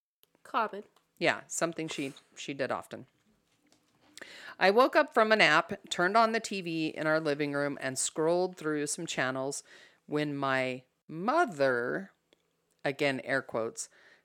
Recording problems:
none

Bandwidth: 17 kHz